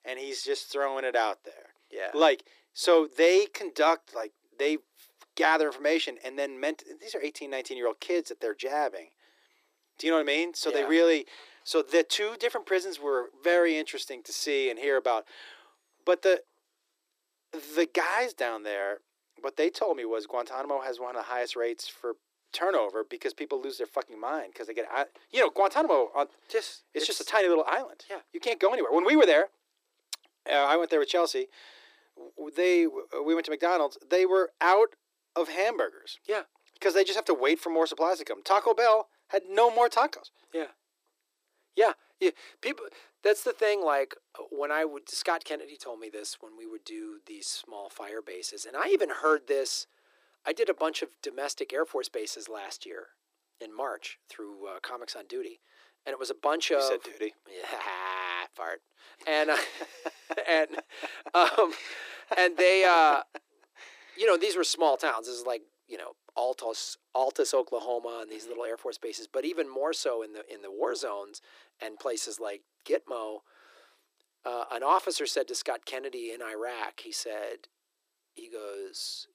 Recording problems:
thin; very; fading below 300 Hz

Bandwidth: 15 kHz